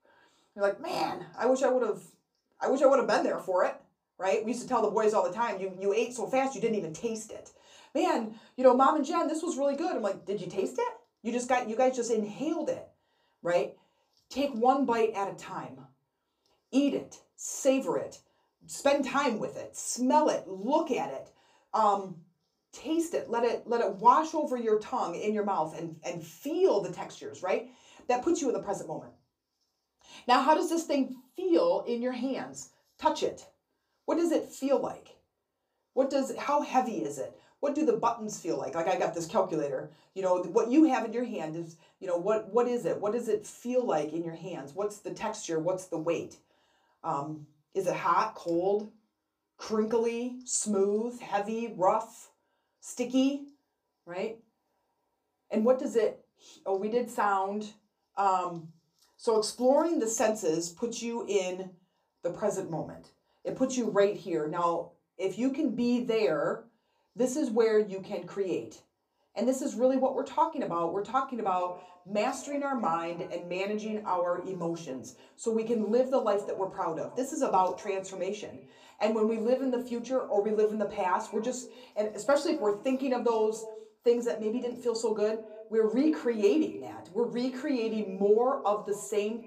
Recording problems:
off-mic speech; far
echo of what is said; faint; from 1:11 on; 130 ms later, 20 dB below the speech
room echo; very slight; dies away in 0.2 s

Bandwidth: 15 kHz